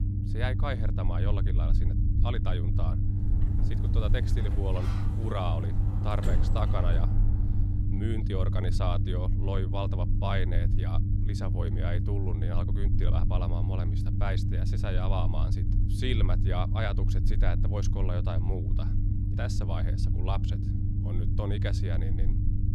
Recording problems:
low rumble; loud; throughout; 5 dB below the speech
door banging; loud; from 3.5 to 7.5 s; peak 3 dB above the speech

